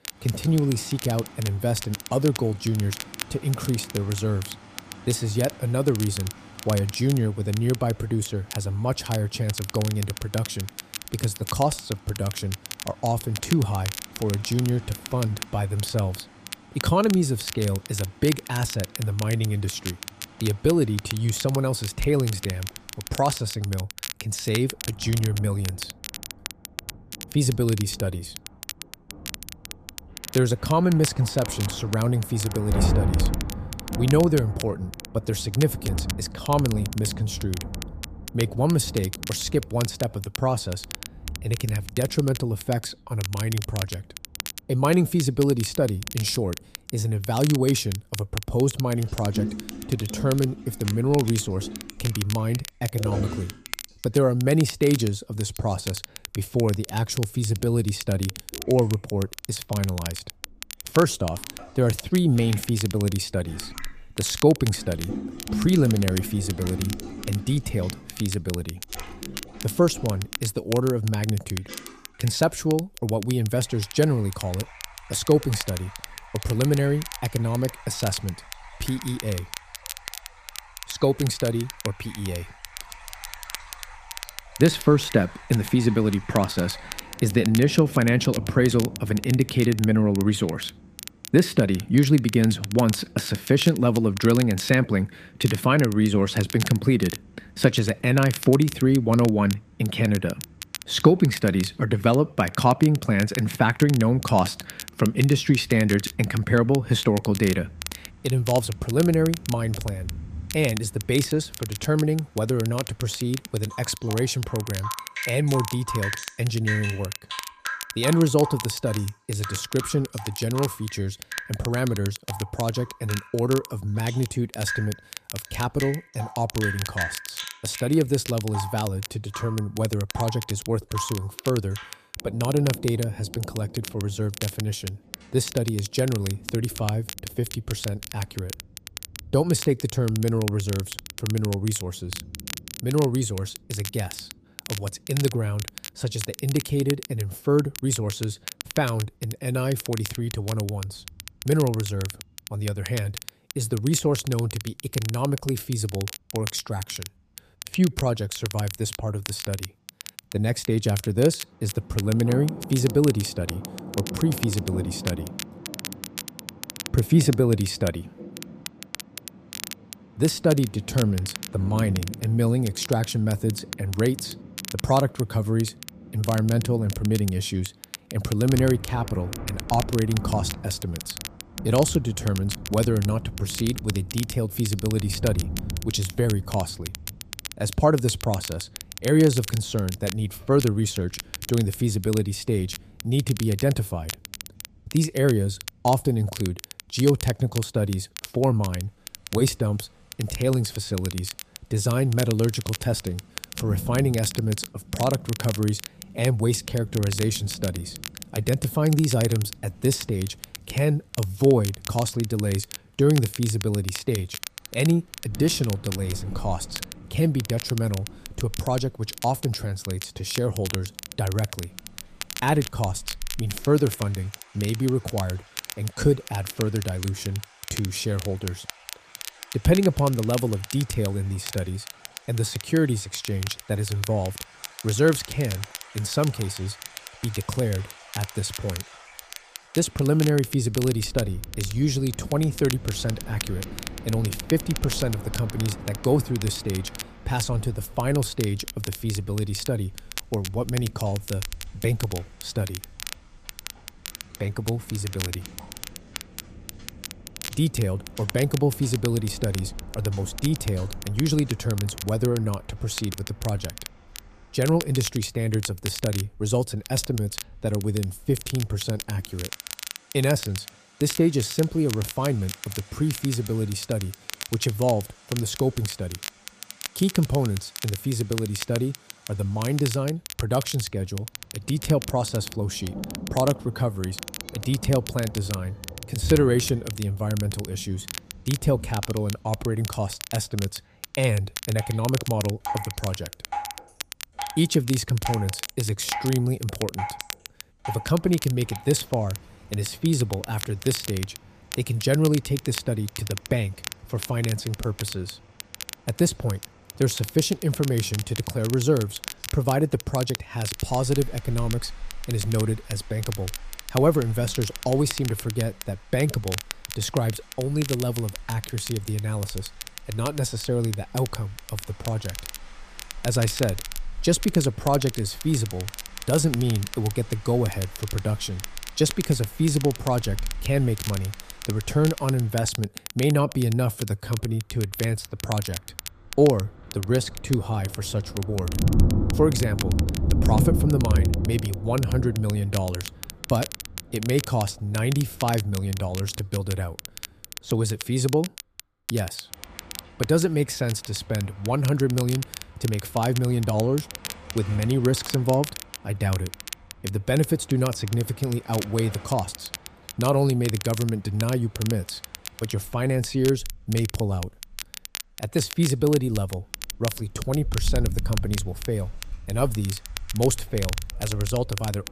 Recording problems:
rain or running water; noticeable; throughout; 10 dB below the speech
crackle, like an old record; noticeable; 10 dB below the speech

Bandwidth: 14.5 kHz